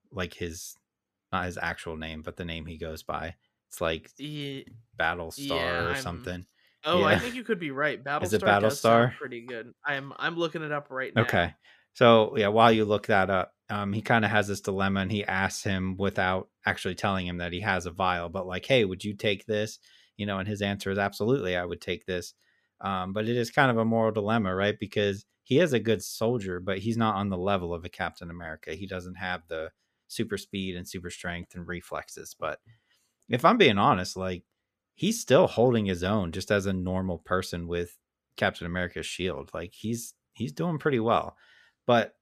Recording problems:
none

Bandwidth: 14.5 kHz